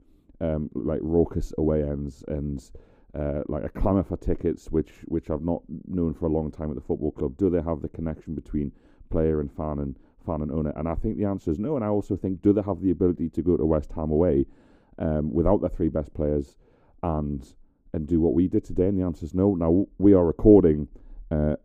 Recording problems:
muffled; very; fading above 1 kHz

